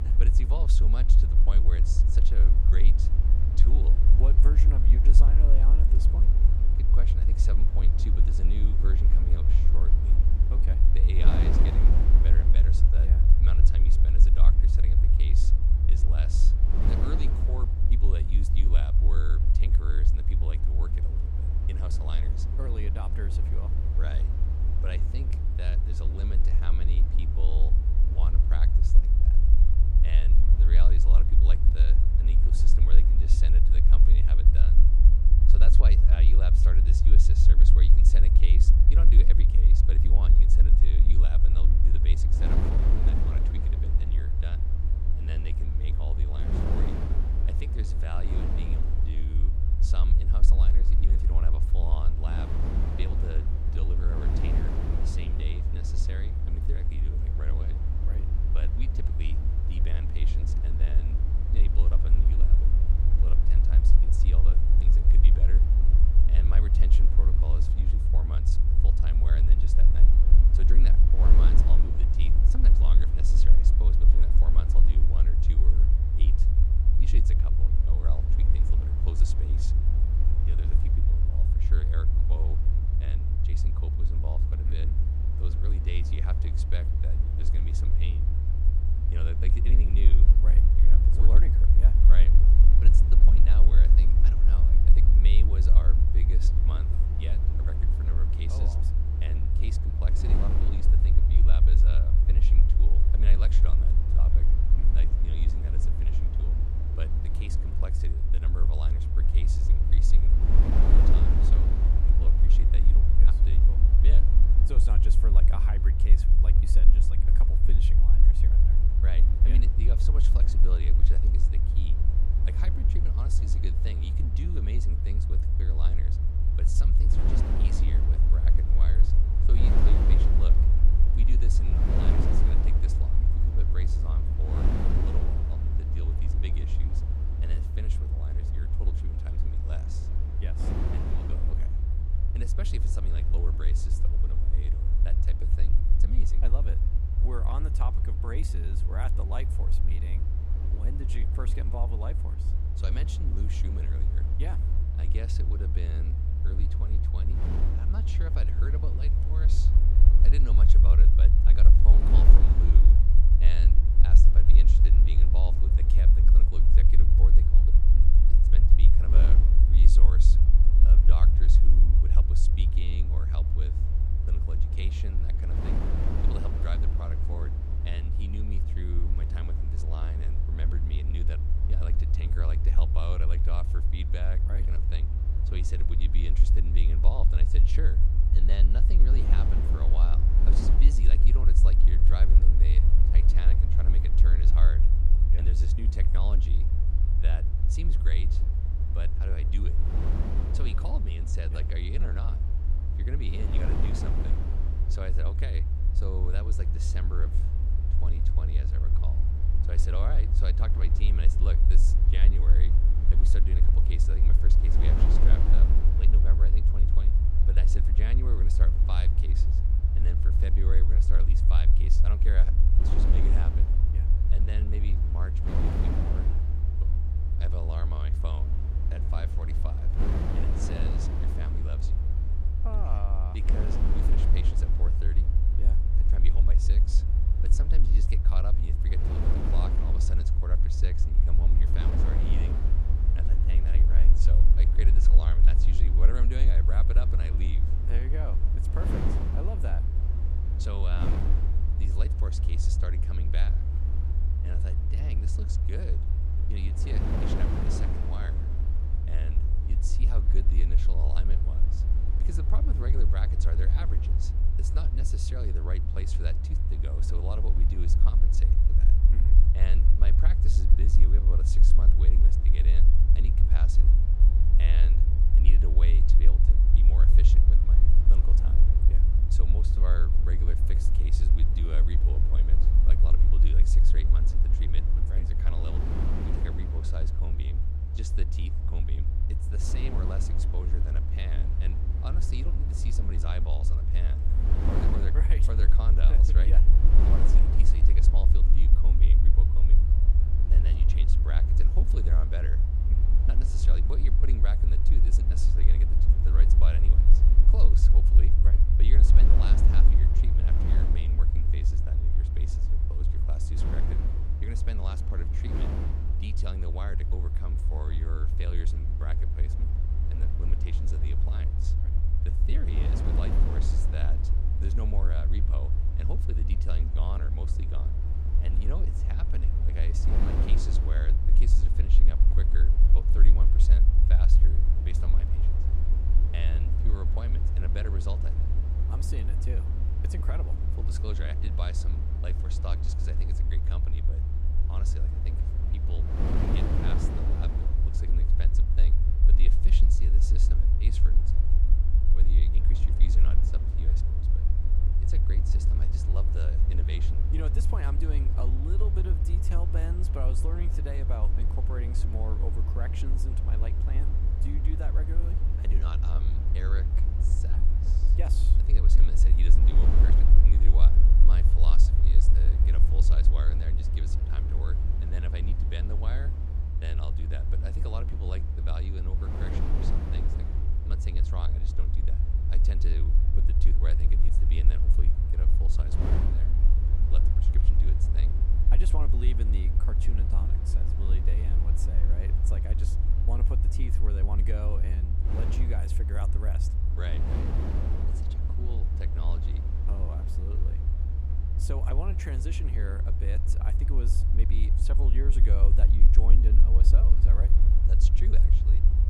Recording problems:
wind noise on the microphone; heavy; 4 dB below the speech
low rumble; loud; throughout; 1 dB below the speech

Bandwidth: 15.5 kHz